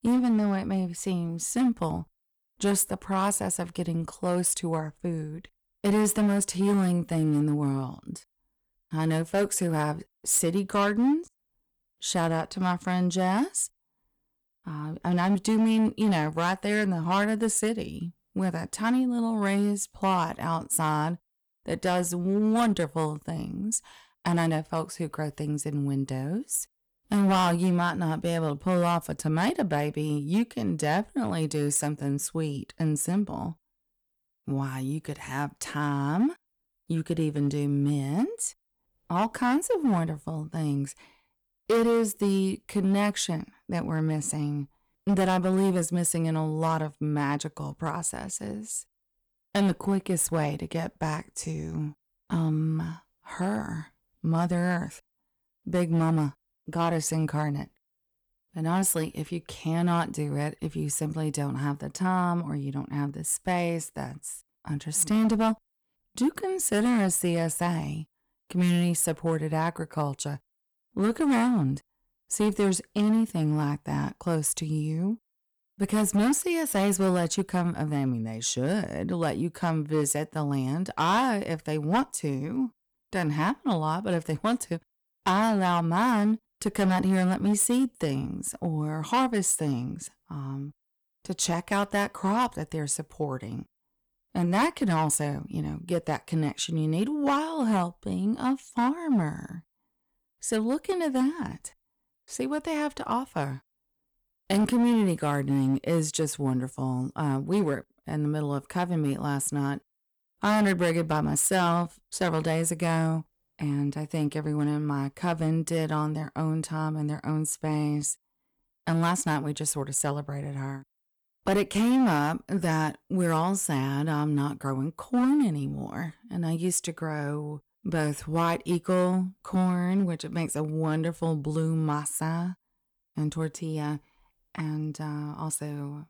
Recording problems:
distortion; slight; 5% of the sound clipped

